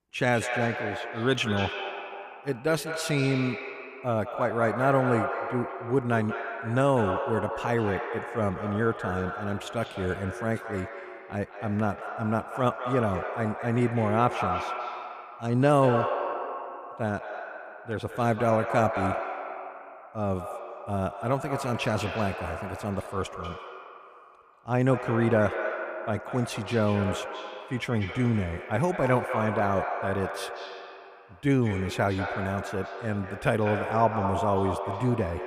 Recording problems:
echo of what is said; strong; throughout; 190 ms later, 6 dB below the speech

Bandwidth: 14.5 kHz